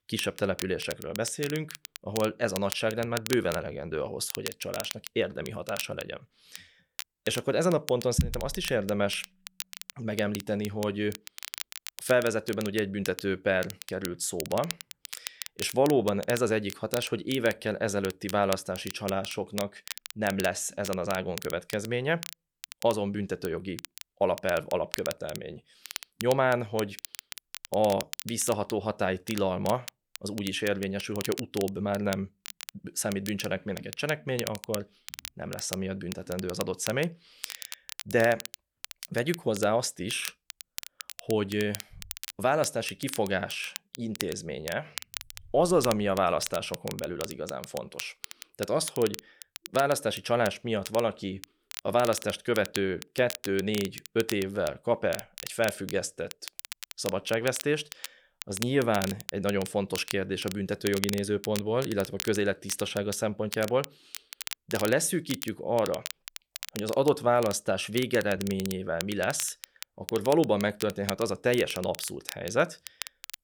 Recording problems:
crackle, like an old record; noticeable; 10 dB below the speech

